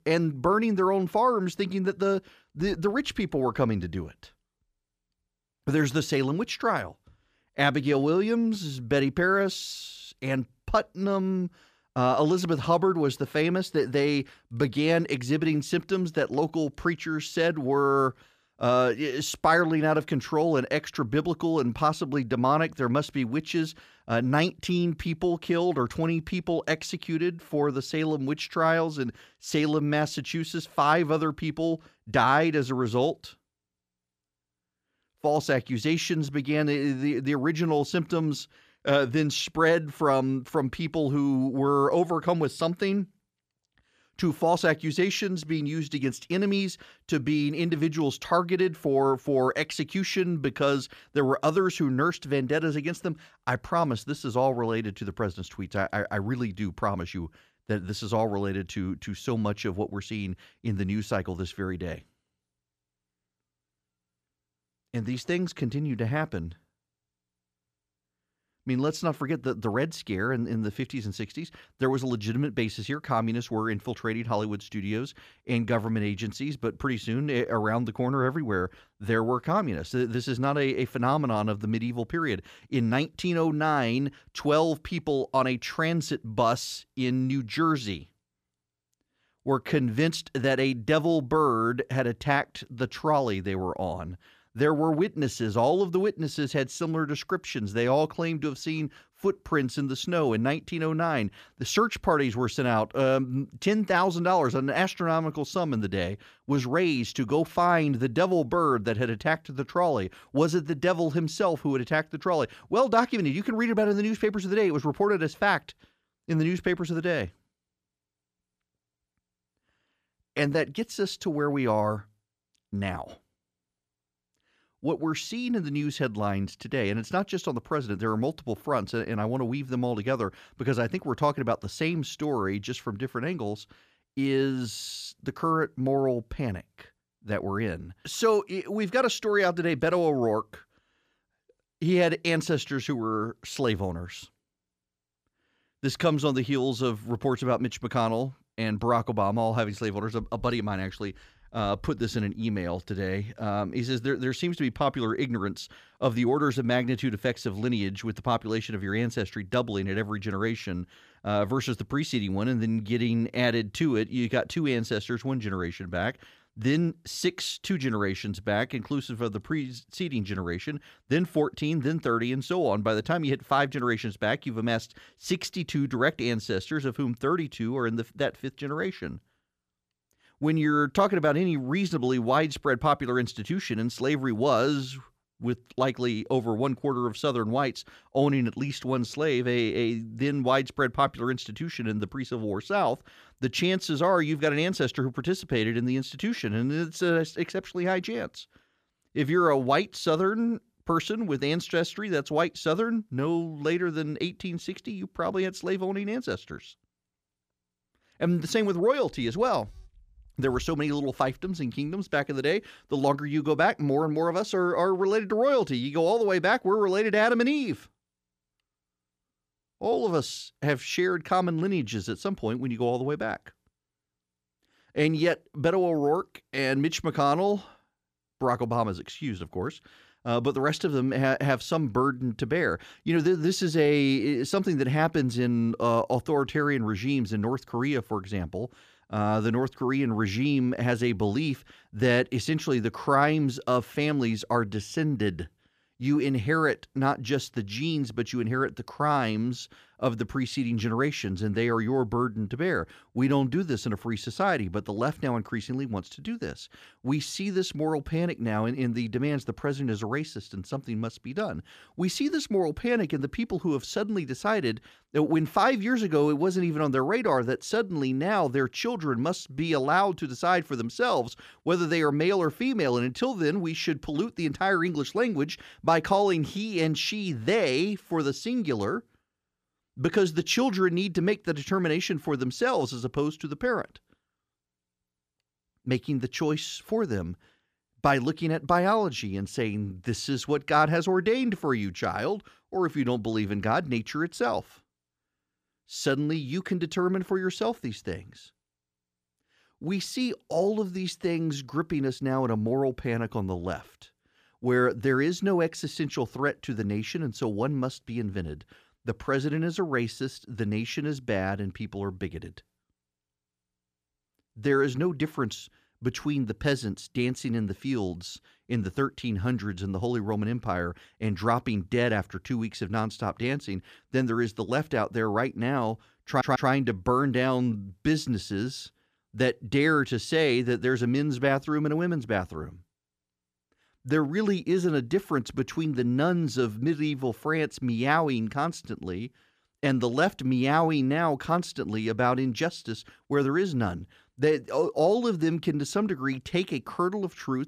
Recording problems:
audio stuttering; at 5:26

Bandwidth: 14.5 kHz